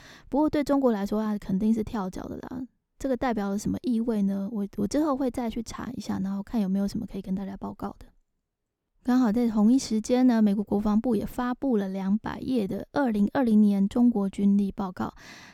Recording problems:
none

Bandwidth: 18.5 kHz